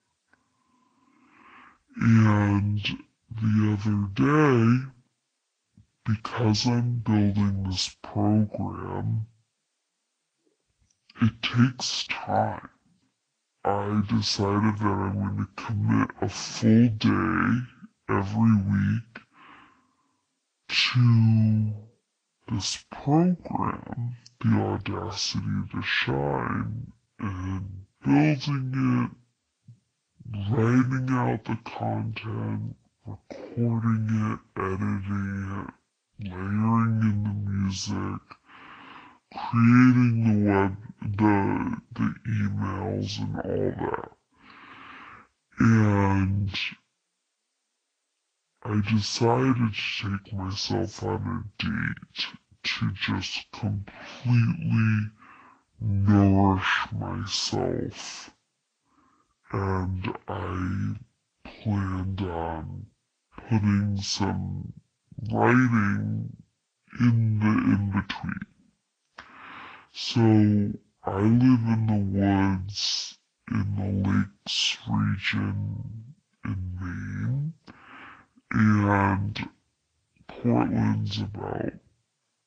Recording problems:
wrong speed and pitch; too slow and too low; 0.5 times normal speed
garbled, watery; slightly

